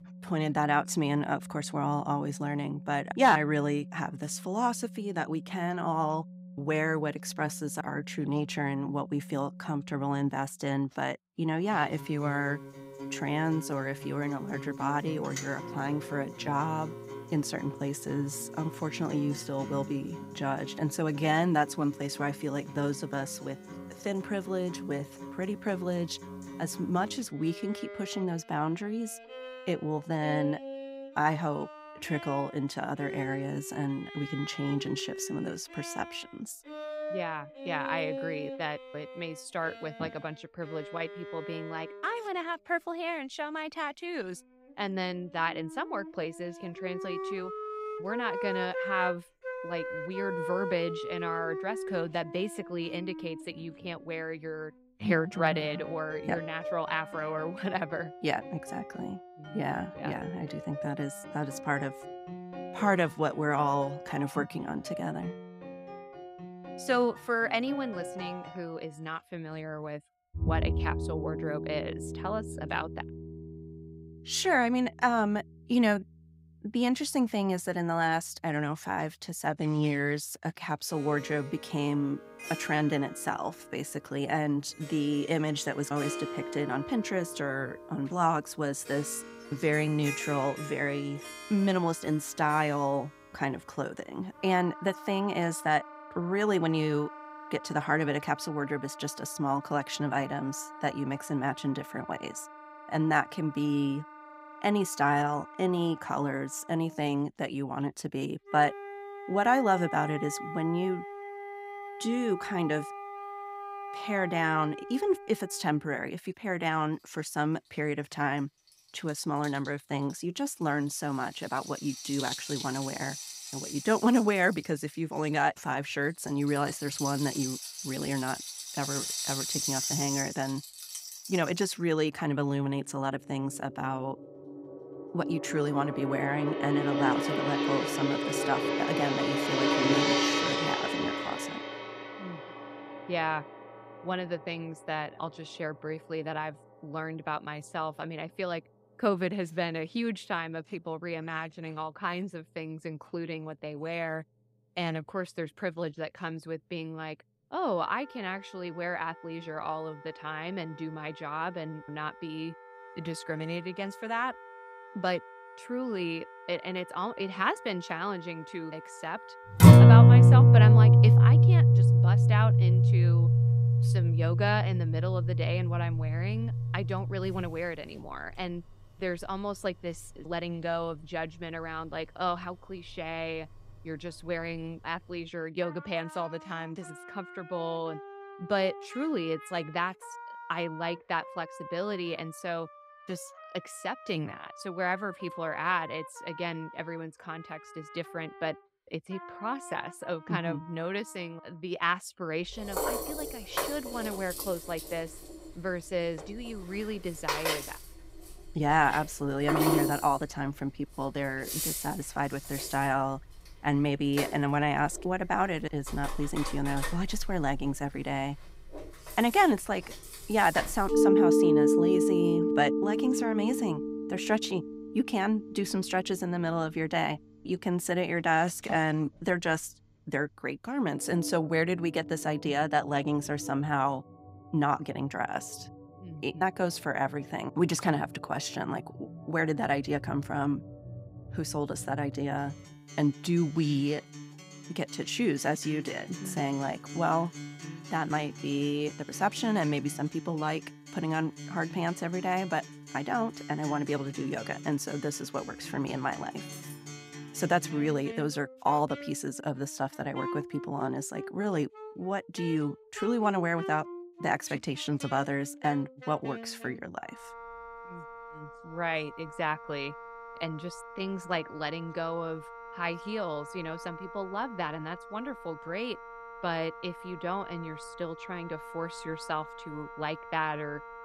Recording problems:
background music; very loud; throughout; 3 dB above the speech
clattering dishes; faint; at 4:17; peak 15 dB below the speech

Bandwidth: 15.5 kHz